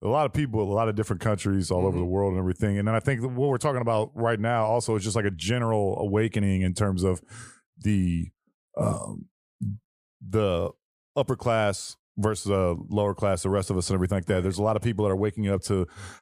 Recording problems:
none

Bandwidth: 15 kHz